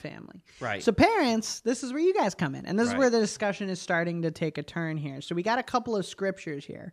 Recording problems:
none

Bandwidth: 14.5 kHz